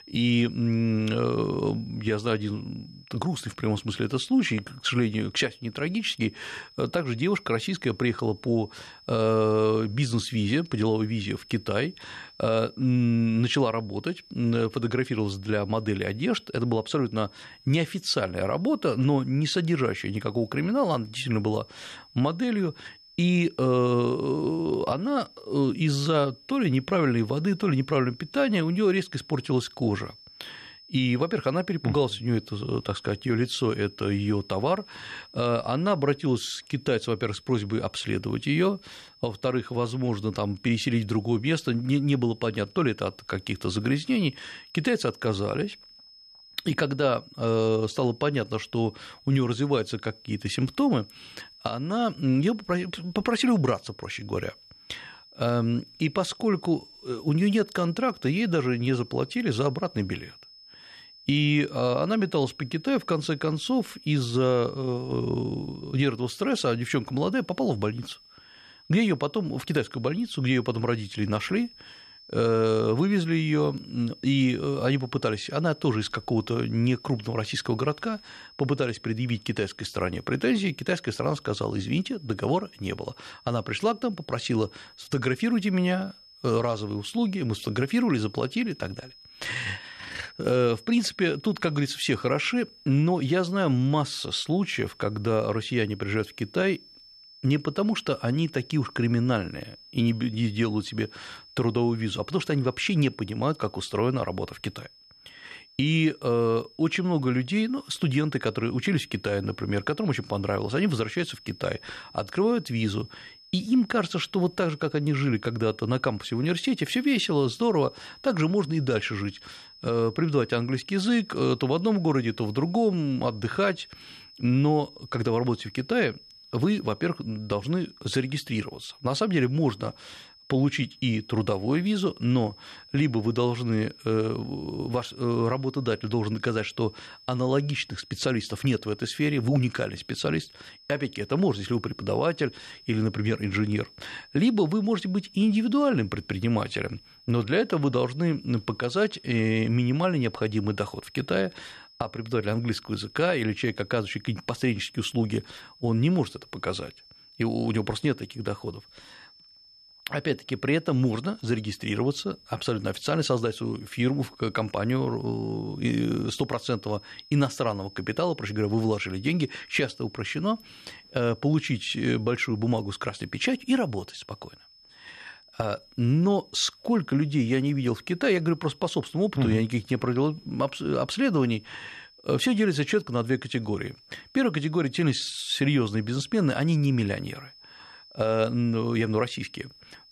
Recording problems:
high-pitched whine; faint; throughout; 5 kHz, 25 dB below the speech

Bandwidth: 13.5 kHz